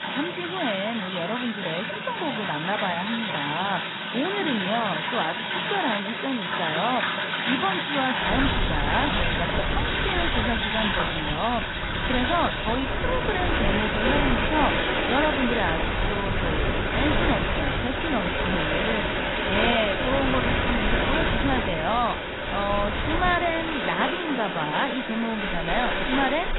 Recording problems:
garbled, watery; badly; nothing above 4 kHz
rain or running water; very loud; throughout; 1 dB above the speech
wind noise on the microphone; heavy; from 8.5 to 24 s; 6 dB below the speech

